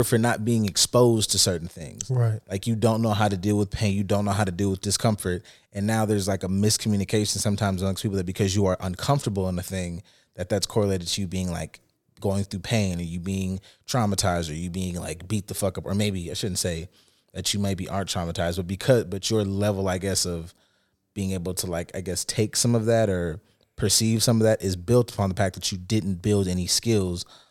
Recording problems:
abrupt cut into speech; at the start

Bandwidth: 17.5 kHz